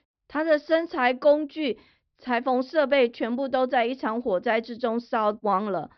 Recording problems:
high frequencies cut off; noticeable; nothing above 5.5 kHz

